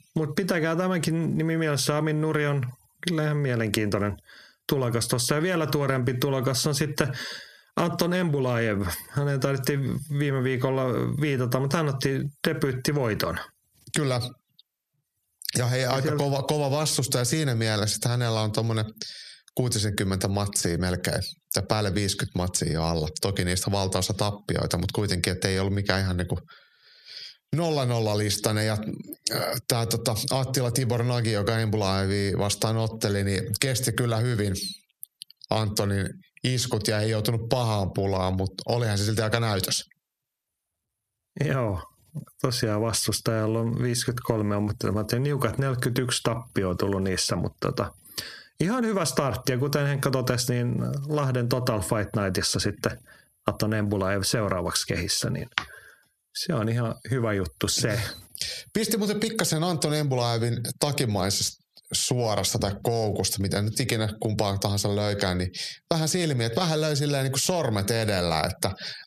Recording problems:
squashed, flat; heavily

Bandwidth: 14.5 kHz